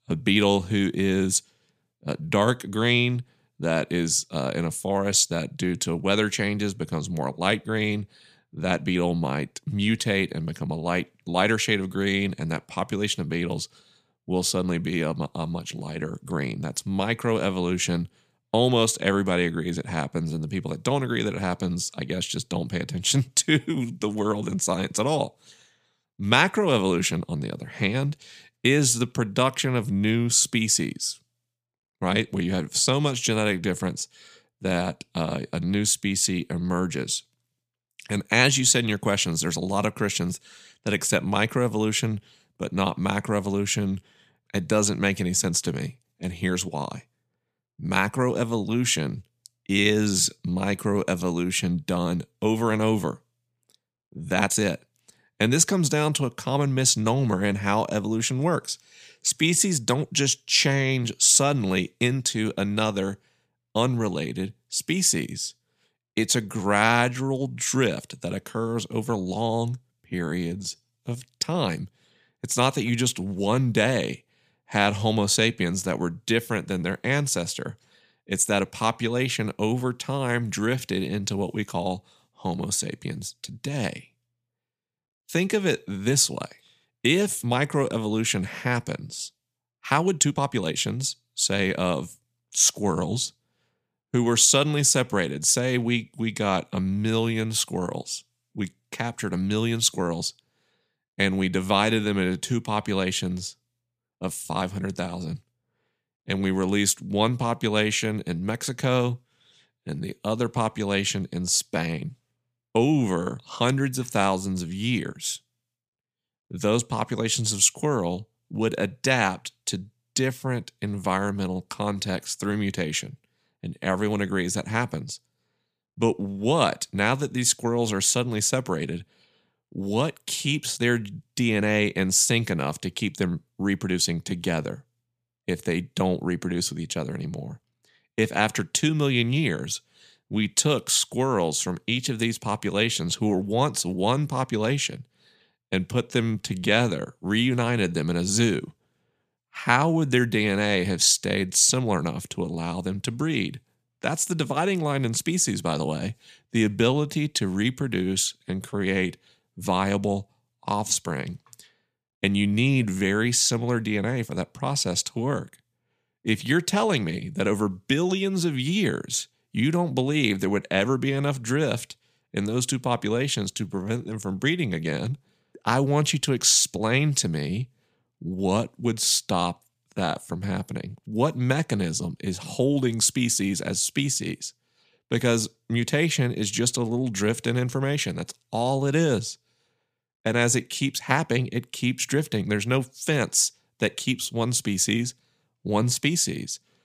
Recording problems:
uneven, jittery; strongly; from 8.5 s to 3:01

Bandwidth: 15 kHz